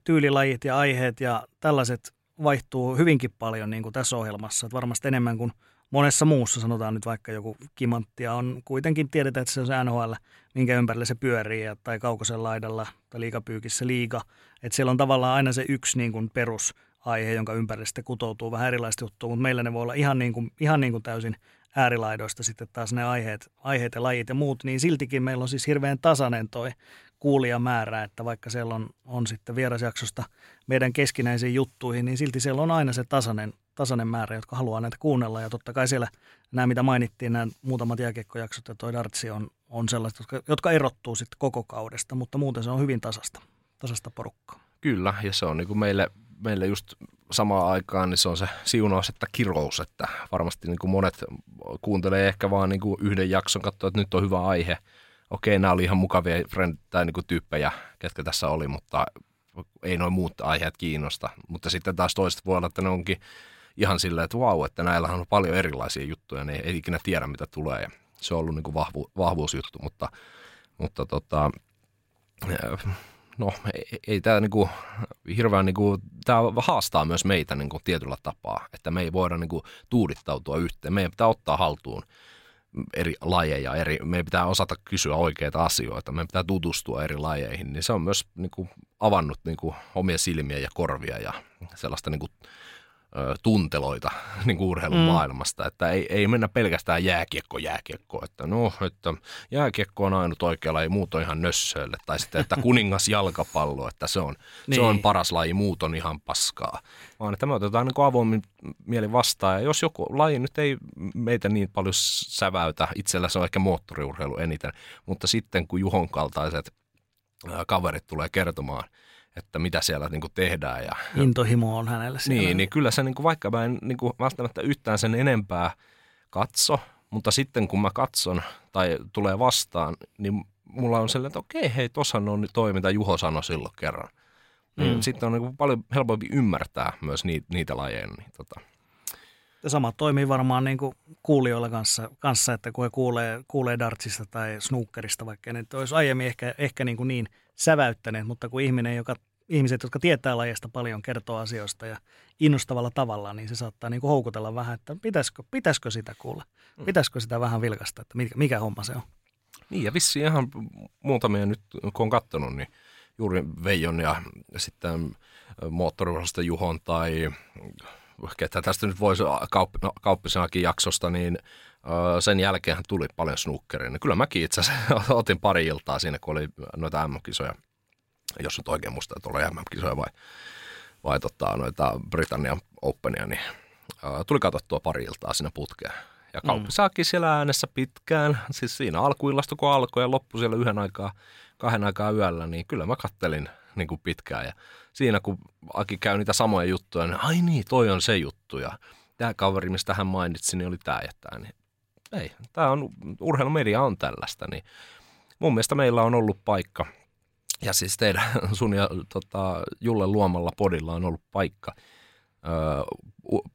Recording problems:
none

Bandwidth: 16 kHz